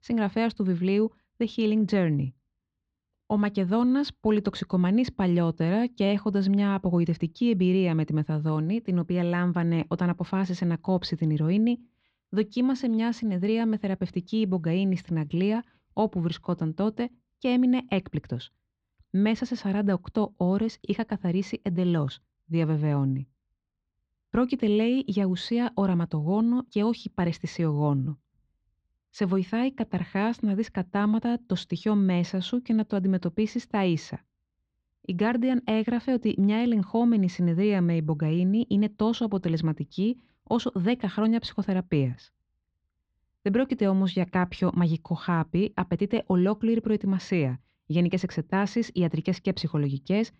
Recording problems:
muffled; slightly; fading above 4 kHz

